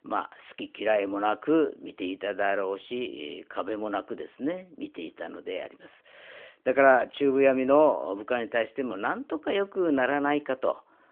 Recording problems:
phone-call audio; nothing above 3.5 kHz

